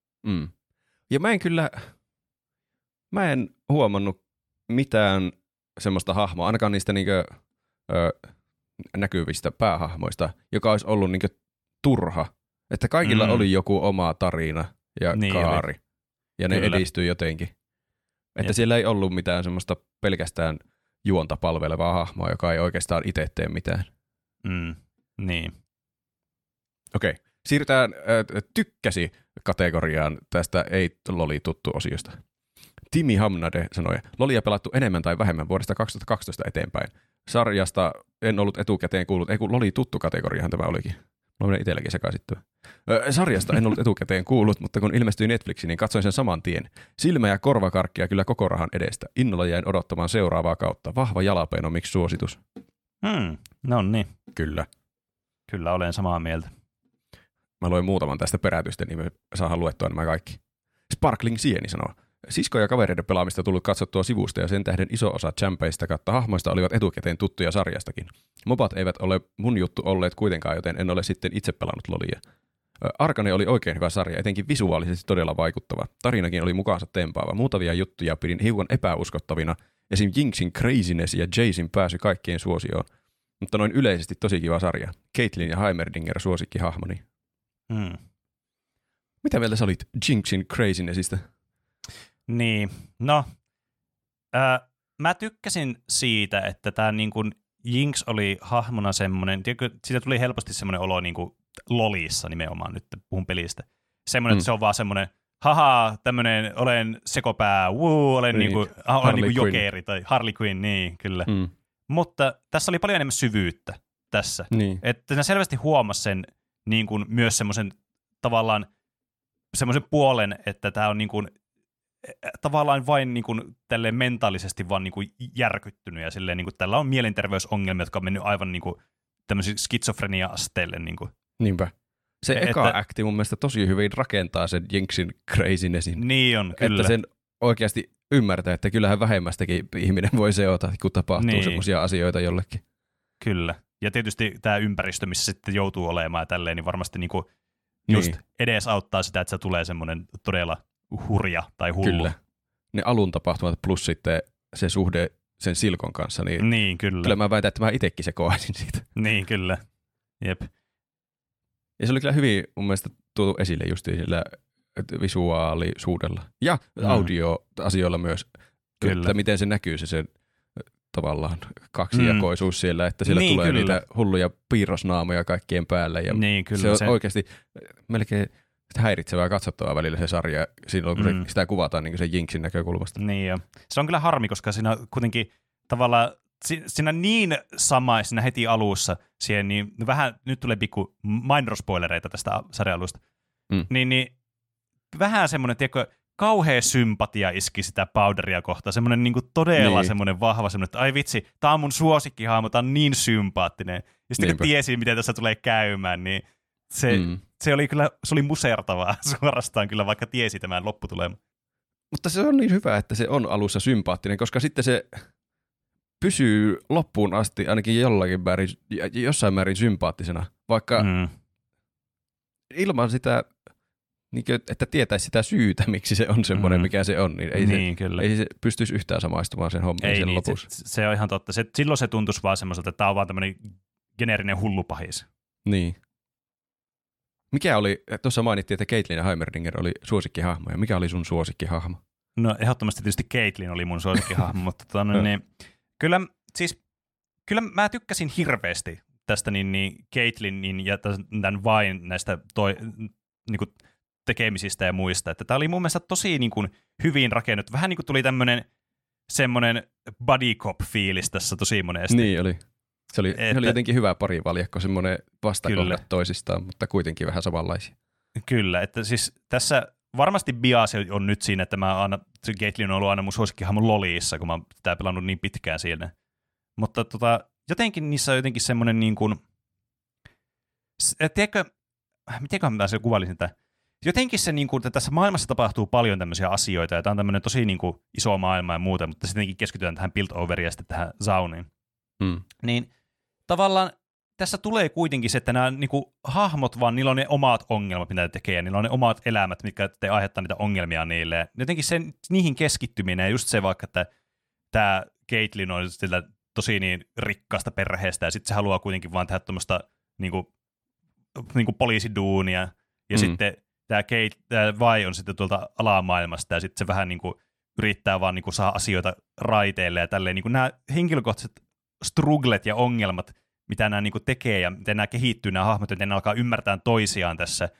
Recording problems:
none

